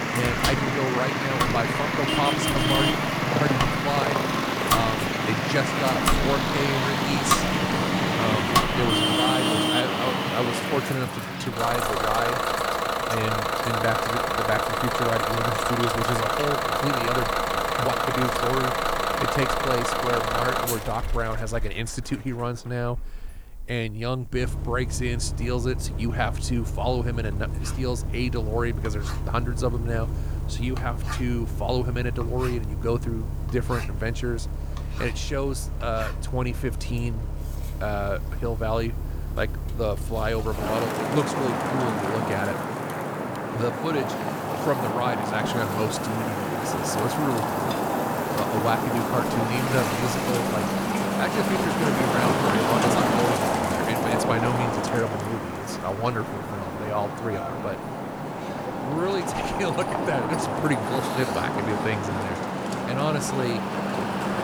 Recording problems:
traffic noise; very loud; throughout; 3 dB above the speech
household noises; loud; throughout; 5 dB below the speech
hiss; faint; throughout; 25 dB below the speech

